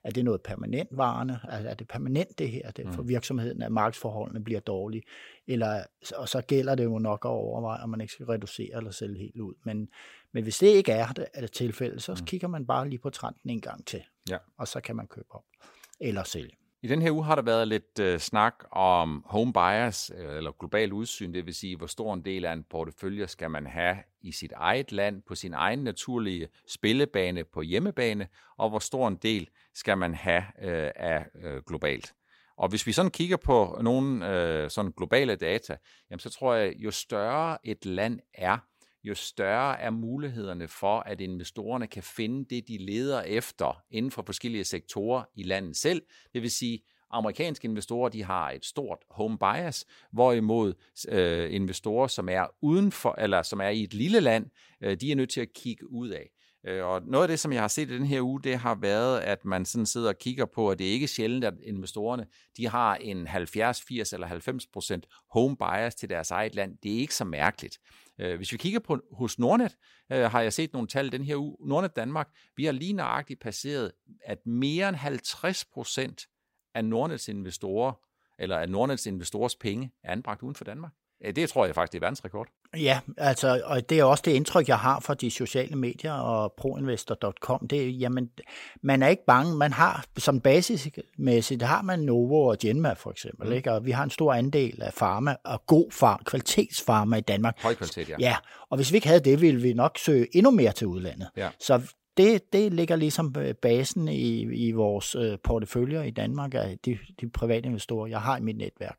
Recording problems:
none

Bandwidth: 16 kHz